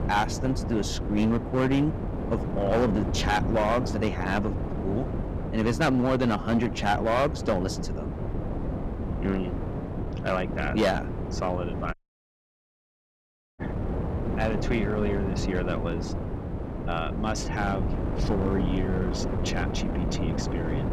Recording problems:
distortion; slight; 6% of the sound clipped
wind noise on the microphone; heavy; 7 dB below the speech
audio cutting out; at 12 s for 1.5 s

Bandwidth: 14.5 kHz